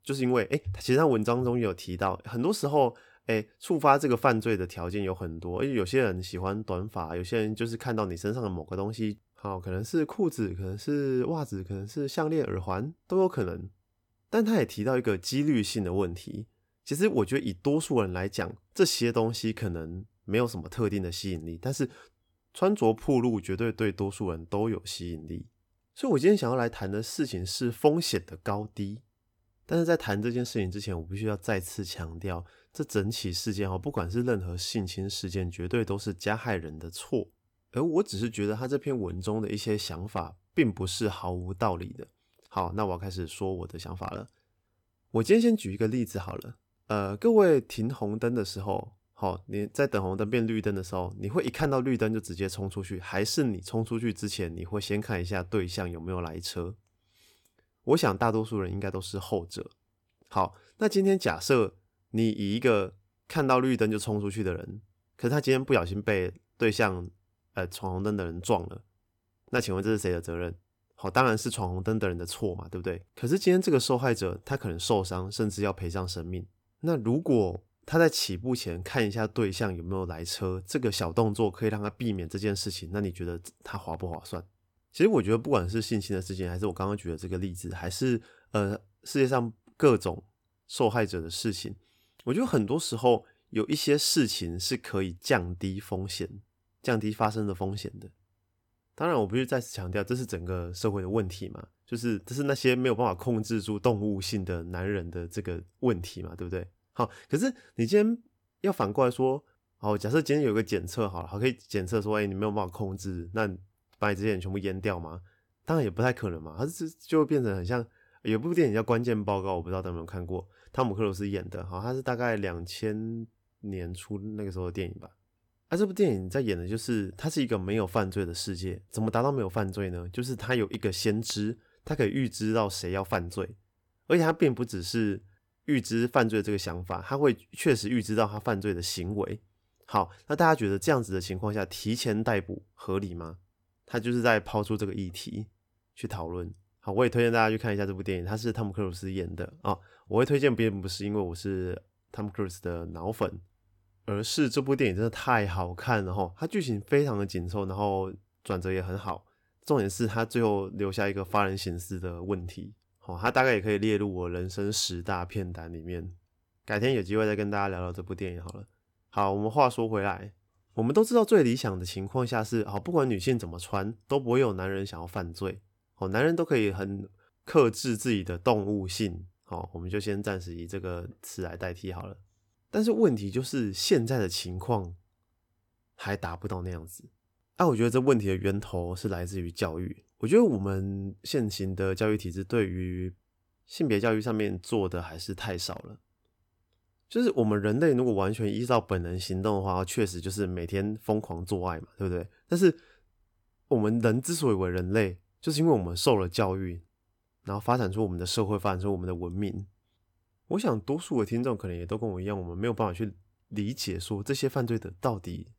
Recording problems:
none

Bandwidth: 18 kHz